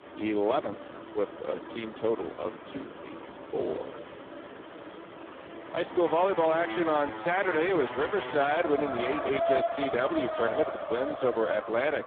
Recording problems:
phone-call audio; poor line
traffic noise; loud; throughout; 7 dB below the speech

